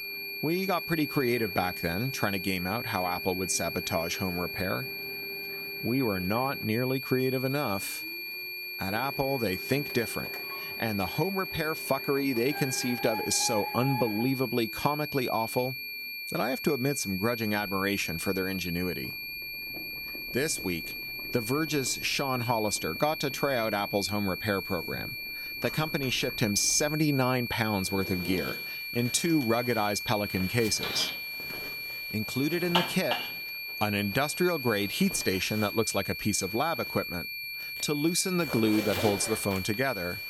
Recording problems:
high-pitched whine; loud; throughout; 2.5 kHz, 5 dB below the speech
household noises; noticeable; throughout; 10 dB below the speech

